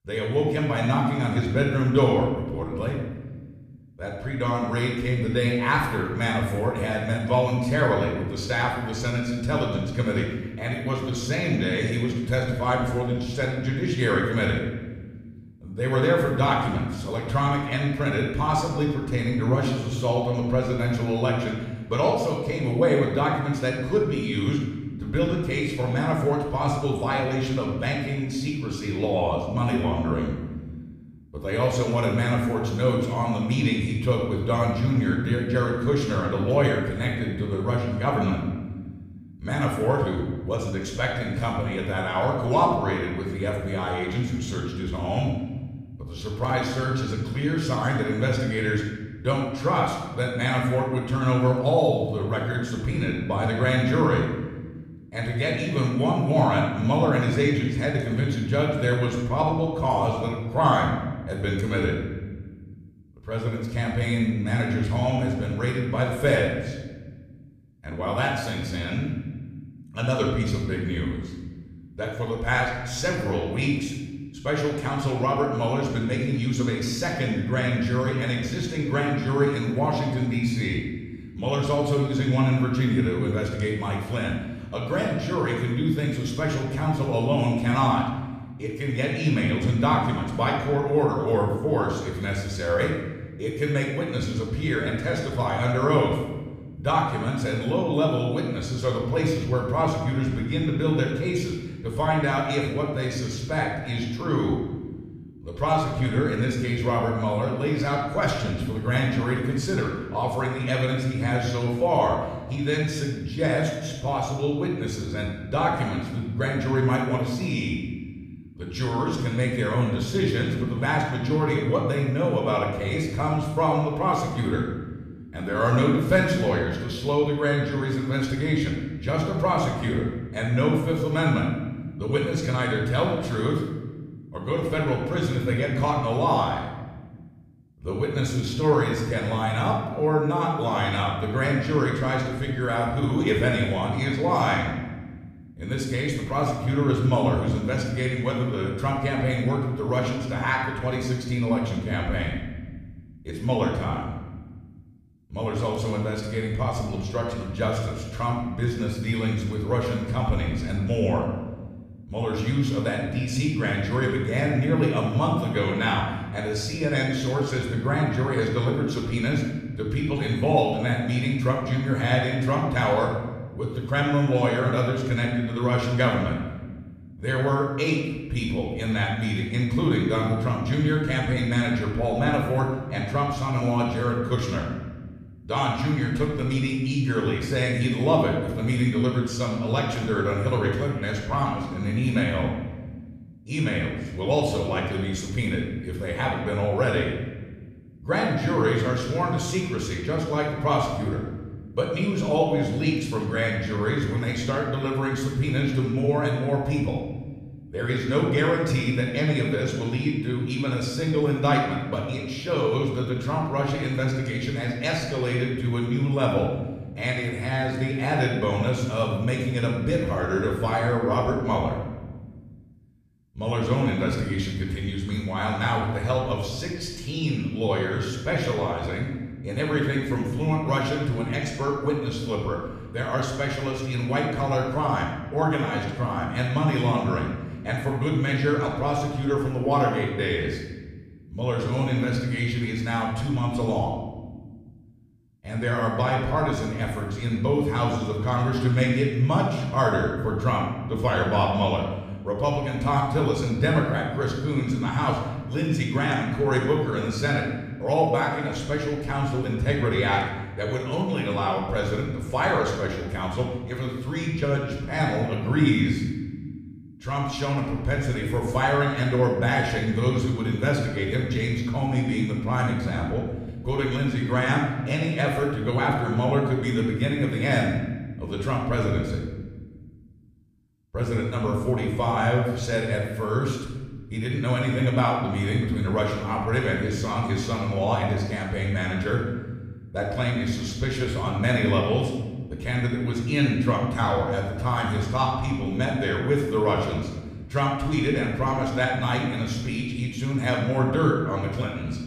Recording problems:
room echo; noticeable; dies away in 1.2 s
off-mic speech; somewhat distant

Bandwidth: 15 kHz